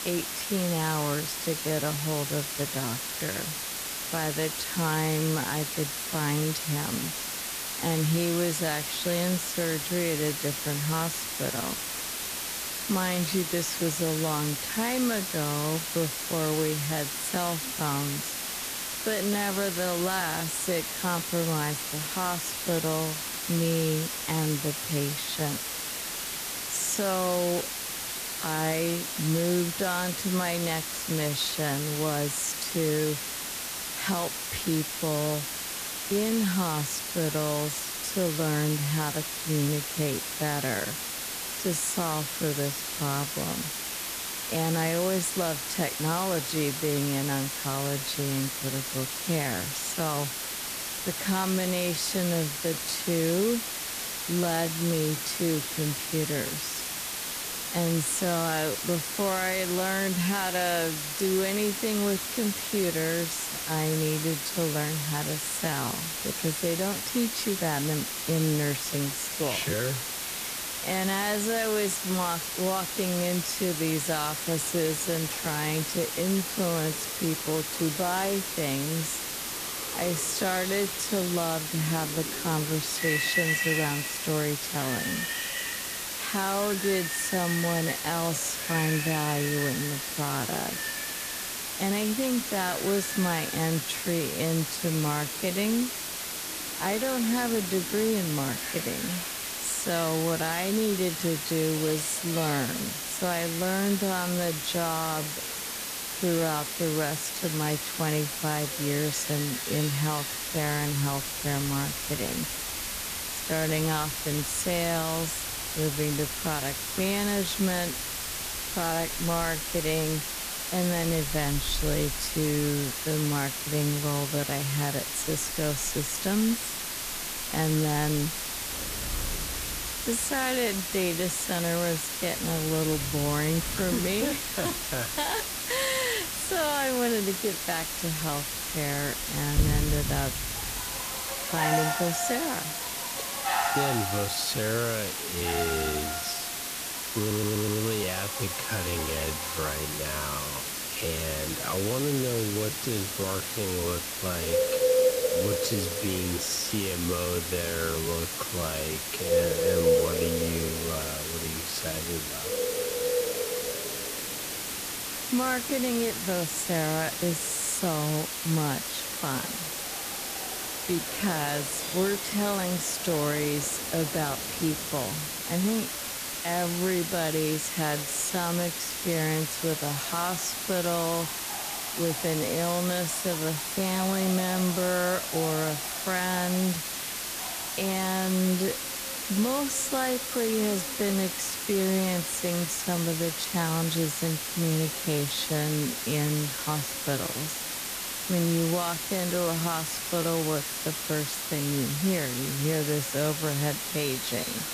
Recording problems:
wrong speed, natural pitch; too slow; 0.6 times normal speed
animal sounds; loud; from 1:14 on; 7 dB below the speech
hiss; loud; throughout; 2 dB below the speech
audio stuttering; at 2:27

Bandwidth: 14.5 kHz